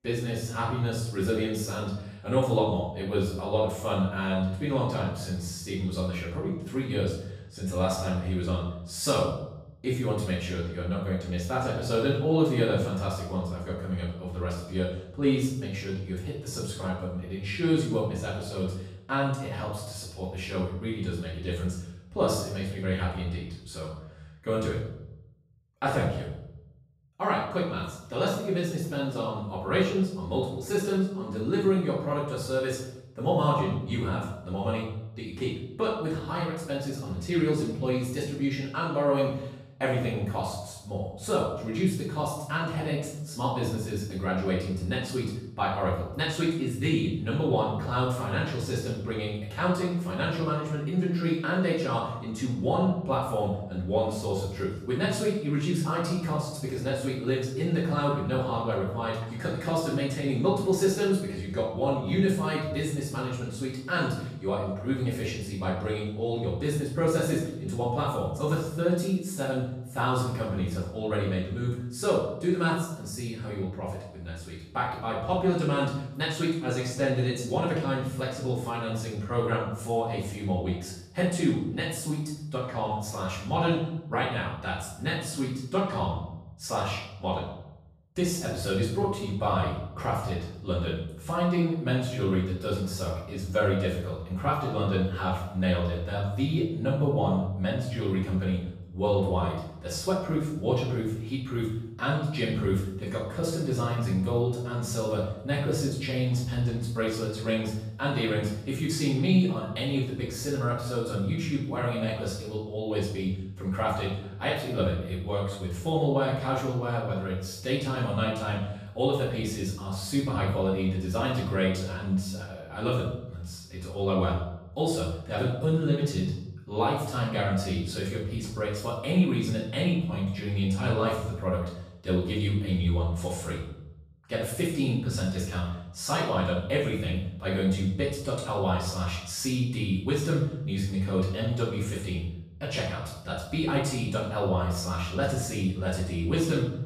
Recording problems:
off-mic speech; far
room echo; noticeable; dies away in 0.7 s

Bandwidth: 14.5 kHz